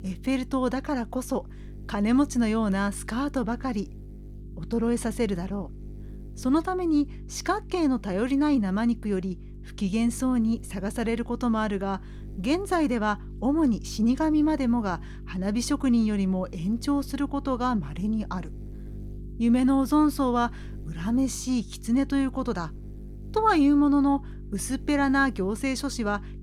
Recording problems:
electrical hum; faint; throughout; 50 Hz, 25 dB below the speech

